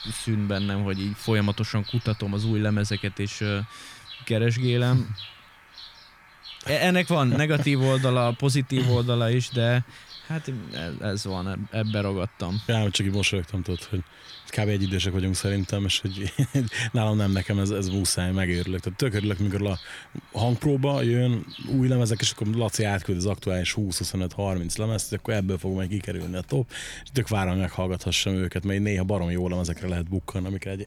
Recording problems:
animal sounds; noticeable; throughout; 20 dB below the speech

